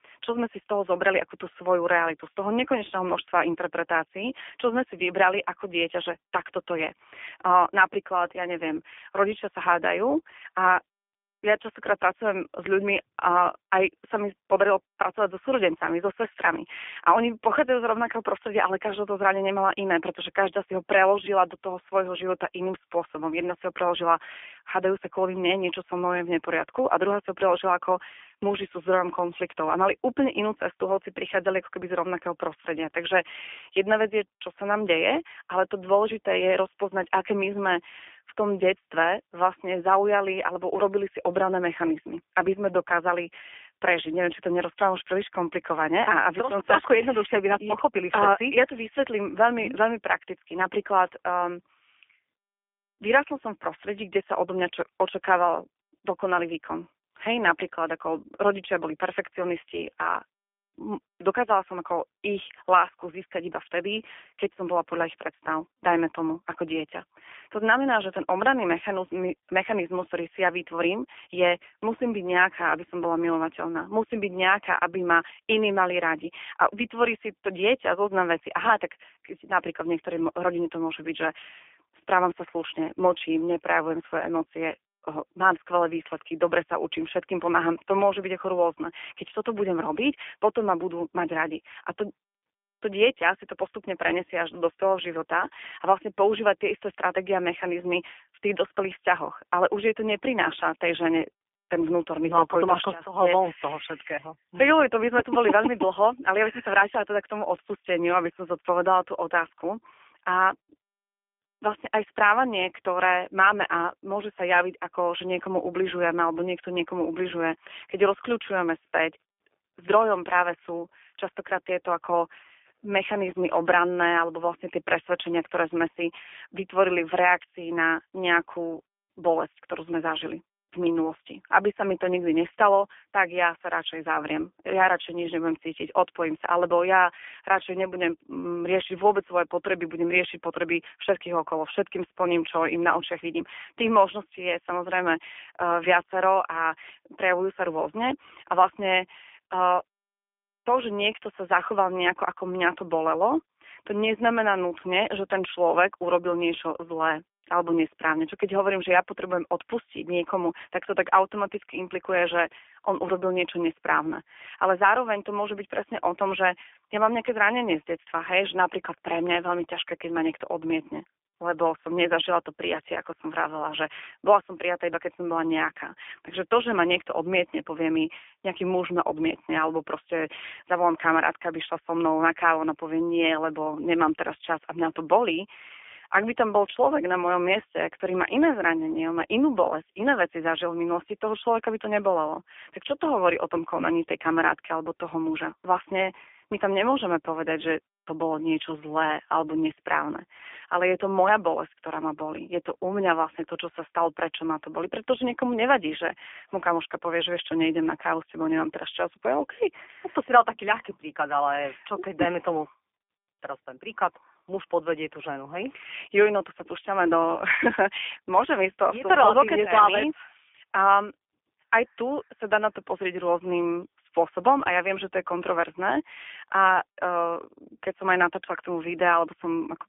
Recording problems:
phone-call audio; nothing above 3.5 kHz

